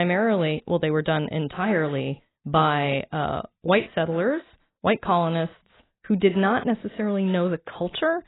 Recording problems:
garbled, watery; badly; nothing above 4 kHz
abrupt cut into speech; at the start

